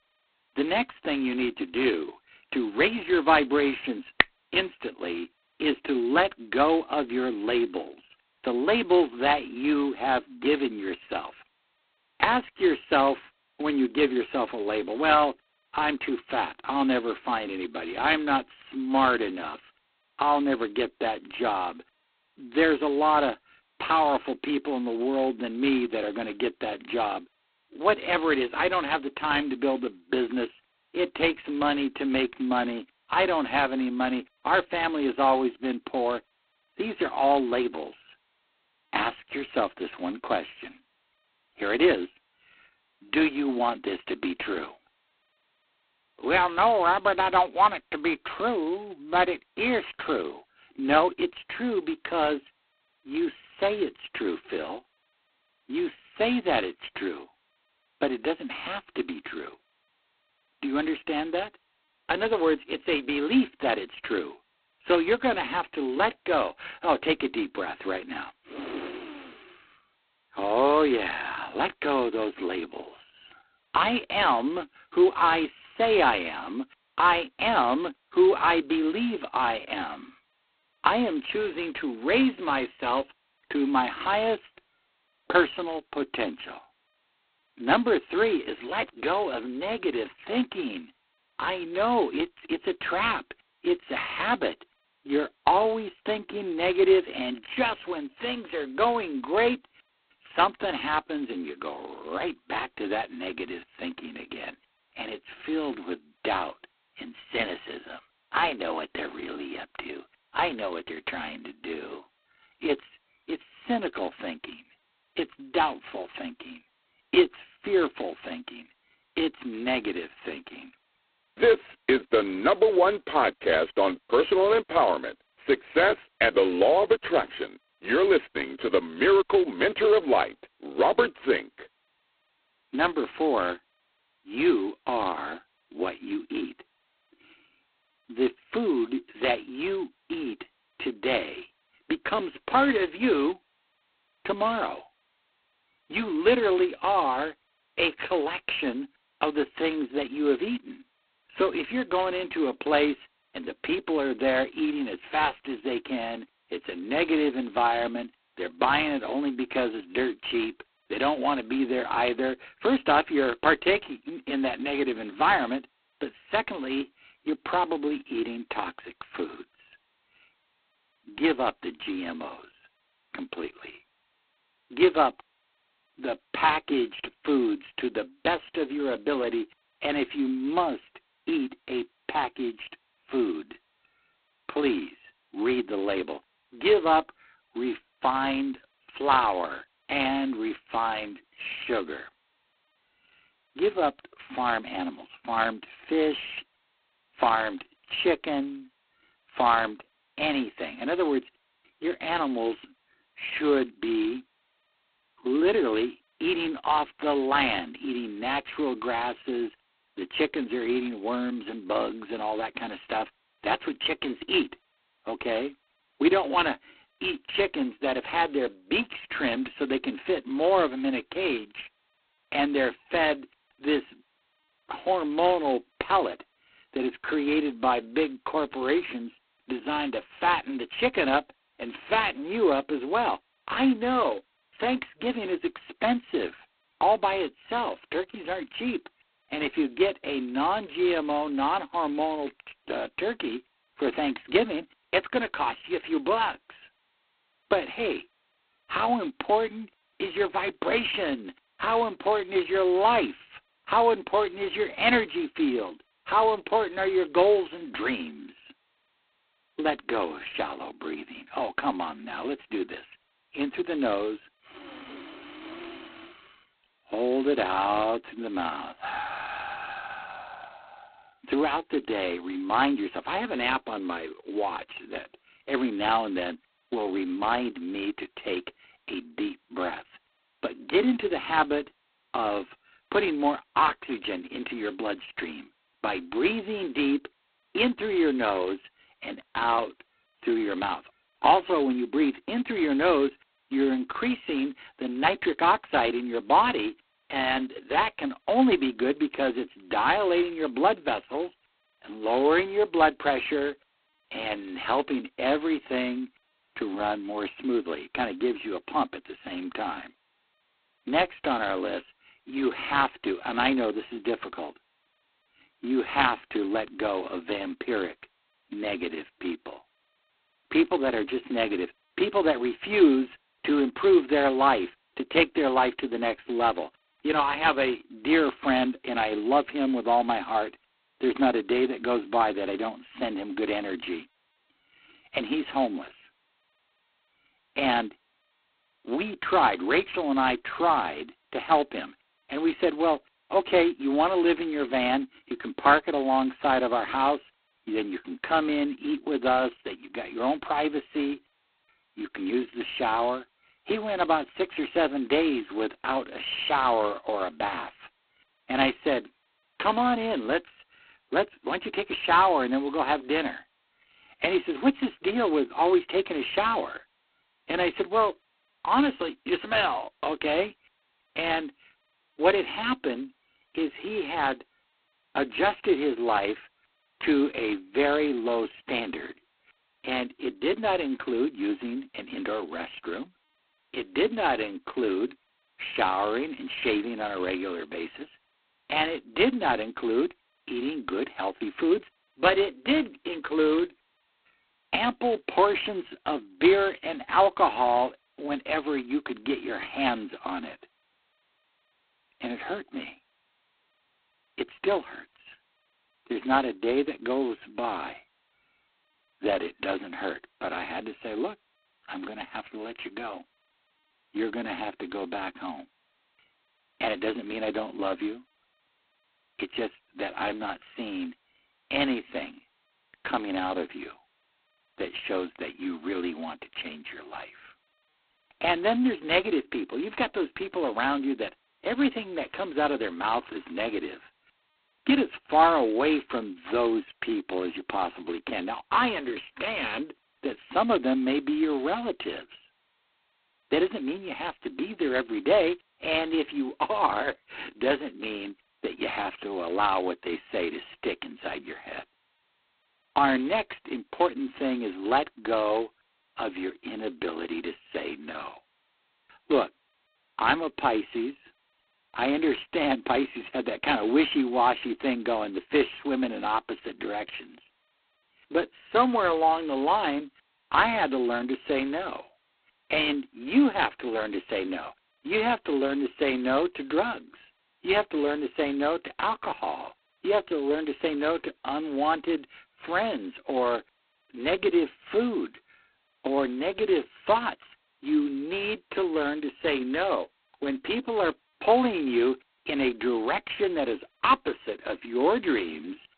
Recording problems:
phone-call audio; poor line; nothing above 4 kHz

